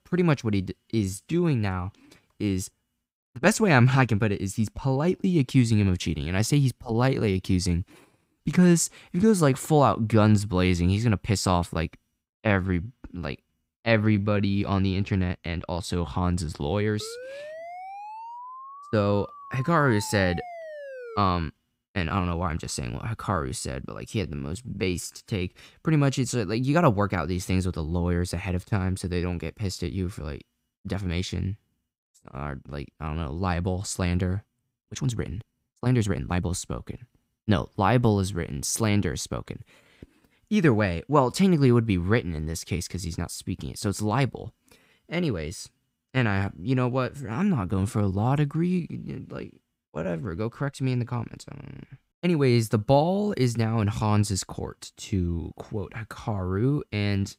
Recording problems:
uneven, jittery; strongly; from 1 to 56 s
siren; faint; from 17 to 21 s; peak 15 dB below the speech

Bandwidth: 15.5 kHz